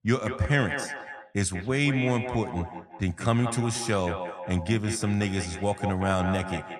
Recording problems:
echo of what is said; strong; throughout; 180 ms later, 9 dB below the speech

